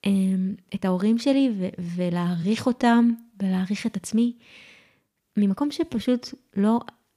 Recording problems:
uneven, jittery; strongly; from 0.5 to 6.5 s

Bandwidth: 15 kHz